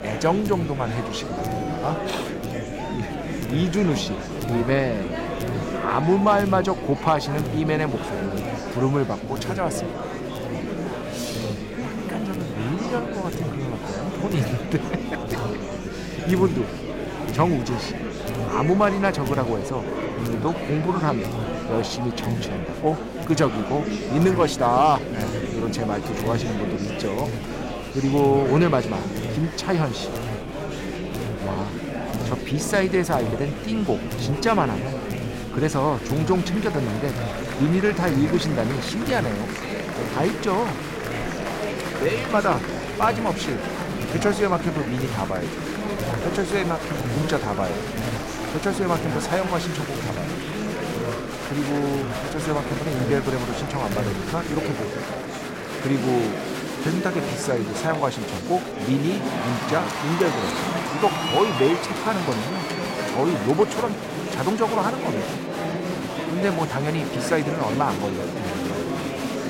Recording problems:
murmuring crowd; loud; throughout; 4 dB below the speech
electrical hum; noticeable; until 55 s; 50 Hz, 20 dB below the speech

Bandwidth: 16 kHz